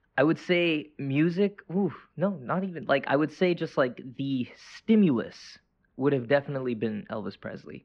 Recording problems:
muffled; very; fading above 2 kHz

